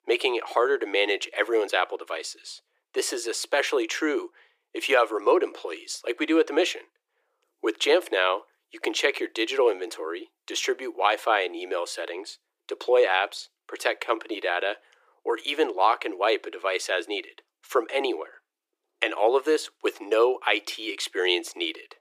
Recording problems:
thin; very; fading below 350 Hz

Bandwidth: 15 kHz